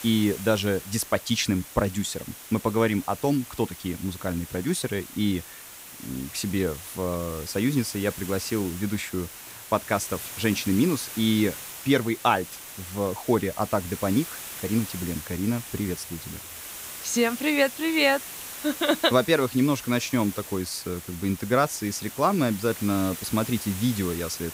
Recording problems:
hiss; noticeable; throughout; 10 dB below the speech

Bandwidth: 15.5 kHz